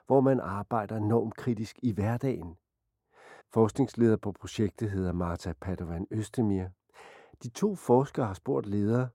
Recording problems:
muffled; very; fading above 2 kHz

